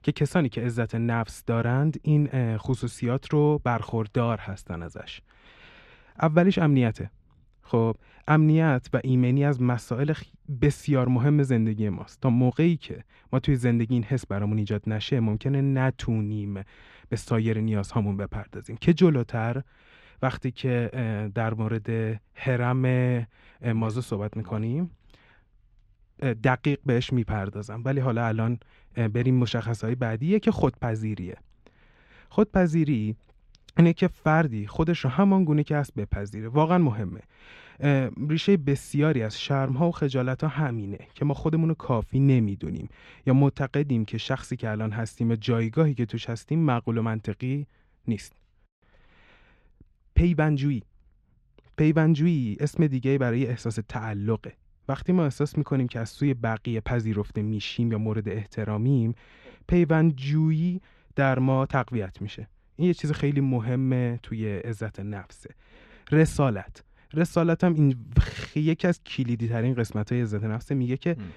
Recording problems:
muffled; slightly; fading above 3.5 kHz

